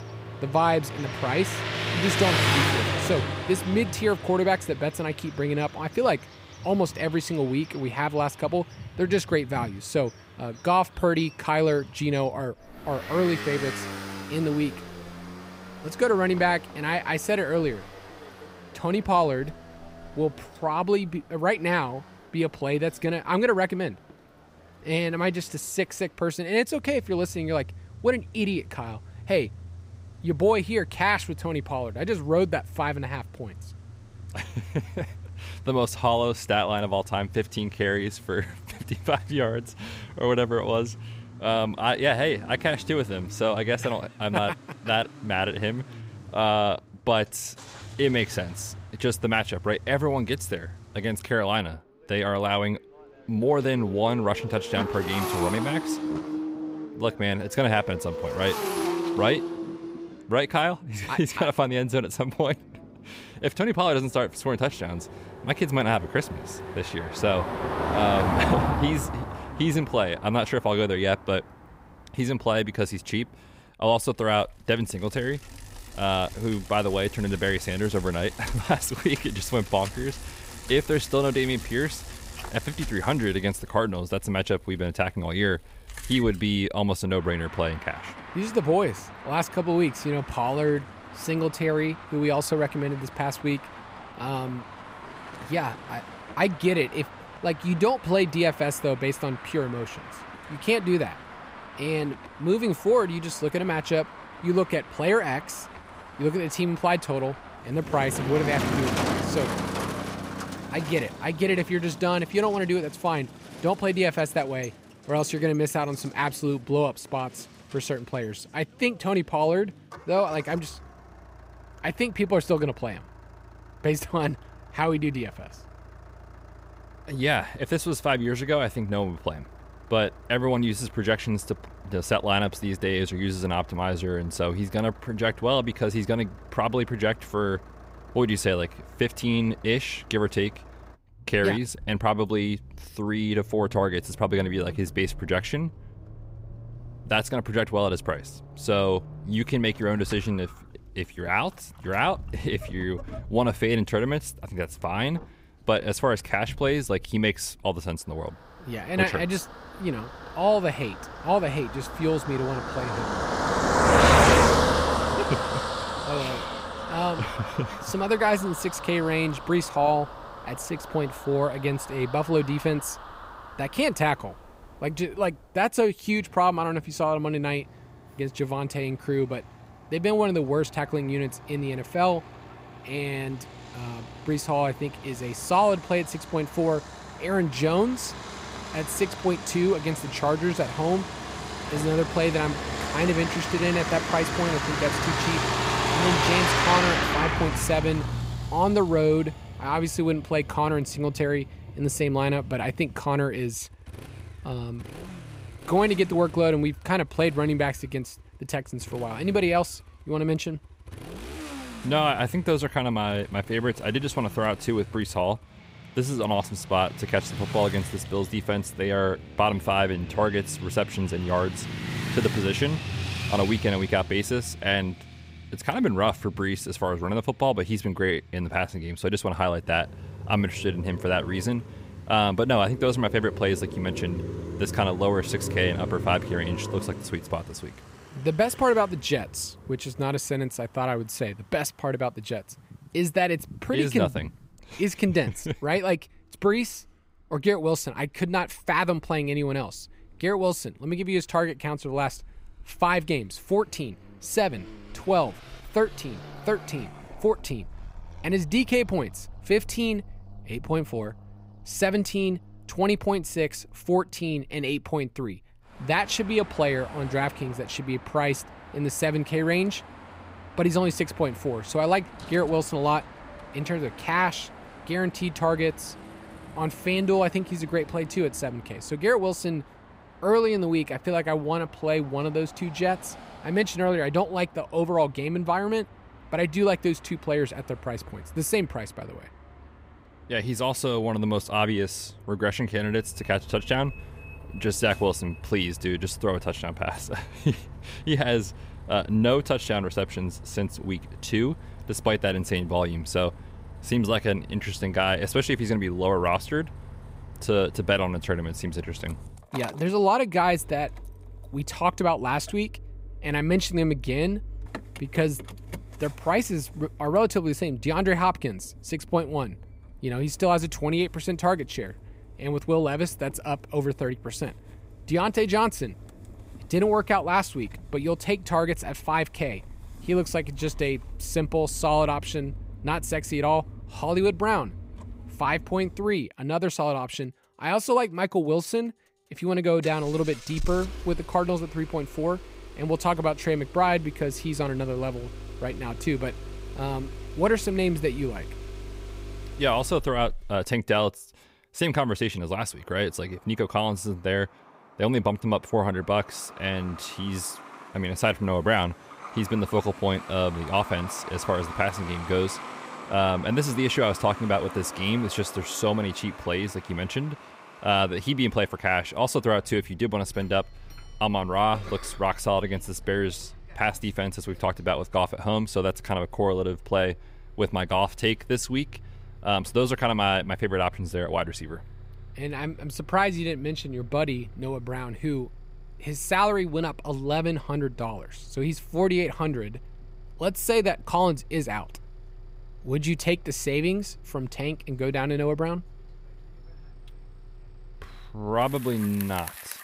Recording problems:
traffic noise; loud; throughout; 8 dB below the speech

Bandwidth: 15.5 kHz